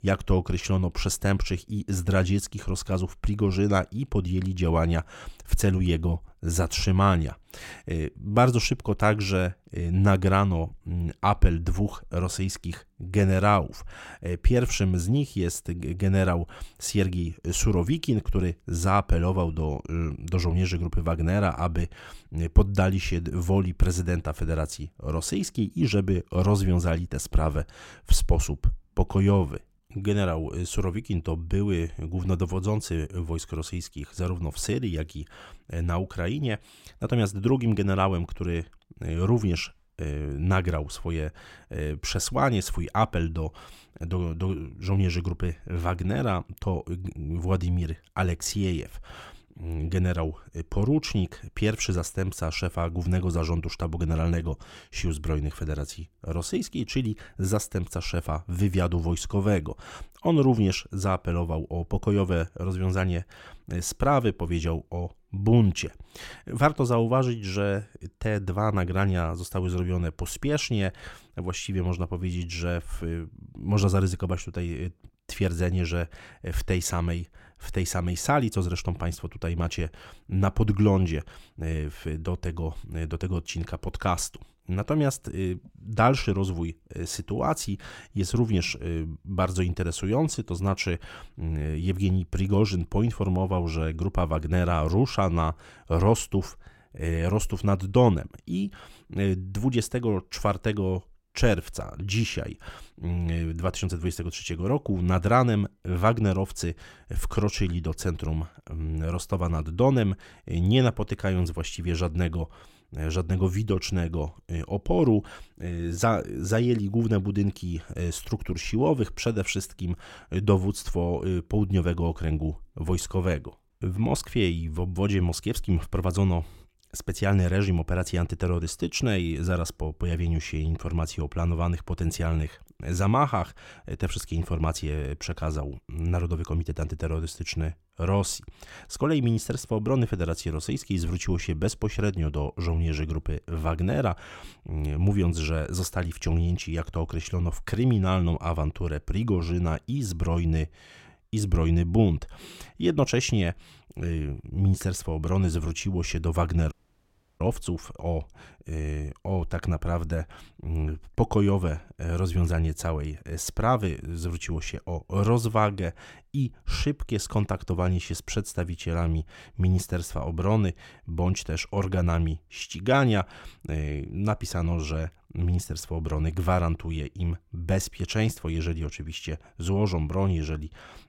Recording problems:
audio cutting out; at 2:37 for 0.5 s

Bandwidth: 16.5 kHz